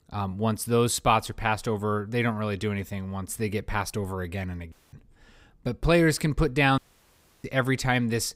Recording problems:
audio cutting out; at 4.5 s and at 7 s for 0.5 s

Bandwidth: 15.5 kHz